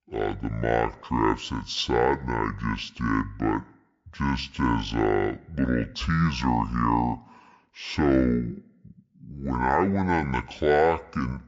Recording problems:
wrong speed and pitch; too slow and too low; 0.5 times normal speed

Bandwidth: 7.5 kHz